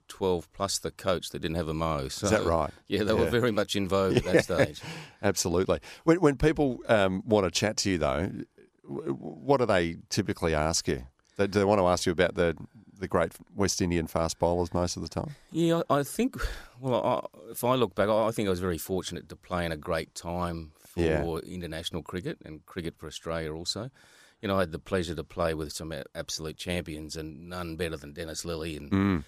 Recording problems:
none

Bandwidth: 14.5 kHz